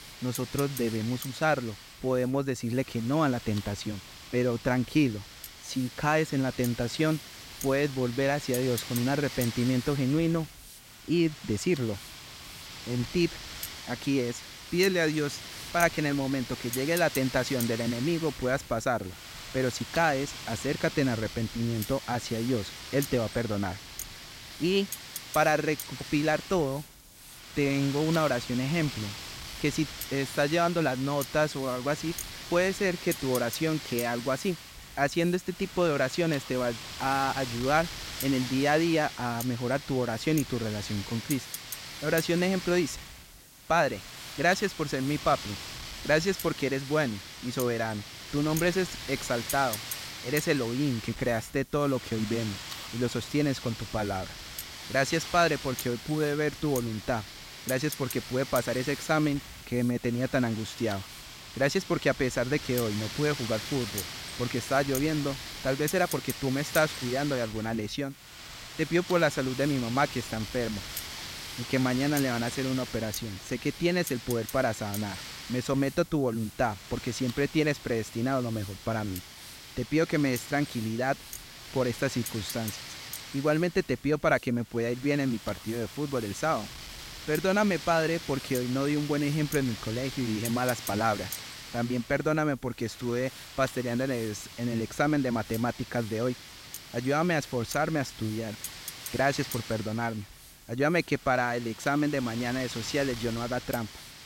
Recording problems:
wind noise on the microphone; heavy; 10 dB below the speech
hiss; faint; throughout; 25 dB below the speech

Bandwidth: 16 kHz